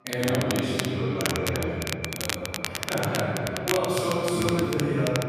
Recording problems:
room echo; strong; dies away in 2.9 s
off-mic speech; far
echo of what is said; noticeable; throughout; 400 ms later, 15 dB below the speech
crackle, like an old record; loud; 5 dB below the speech
background chatter; faint; throughout; 3 voices, 25 dB below the speech

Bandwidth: 14.5 kHz